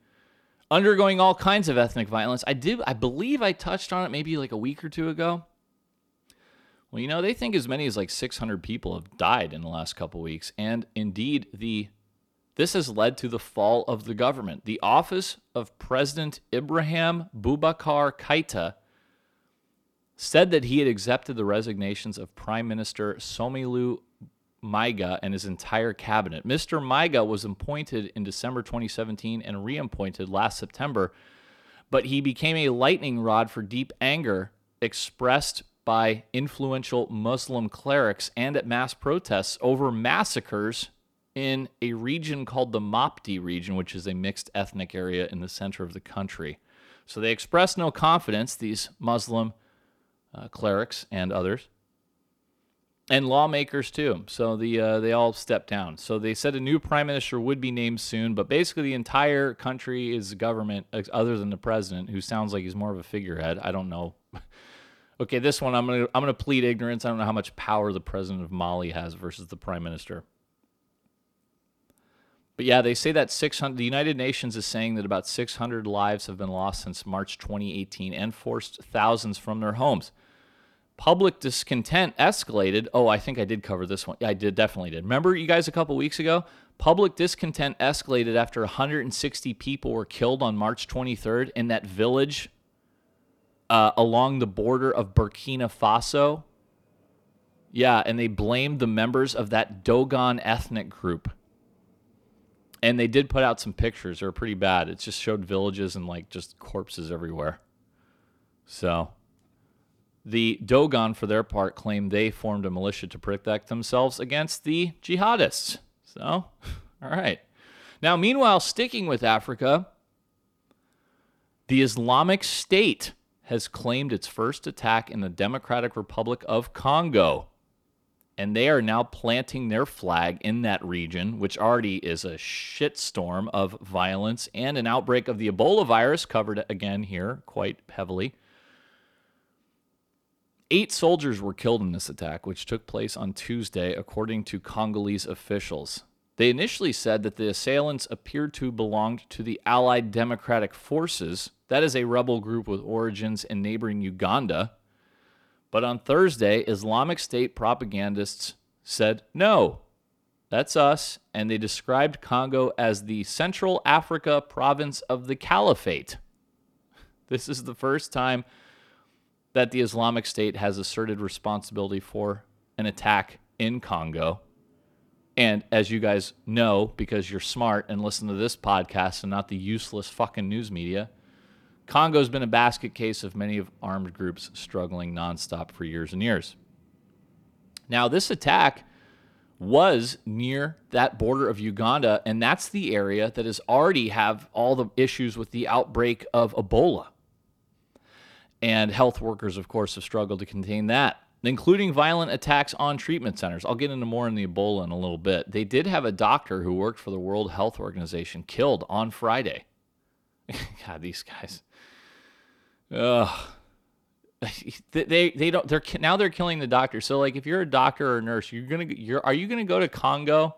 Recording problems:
none

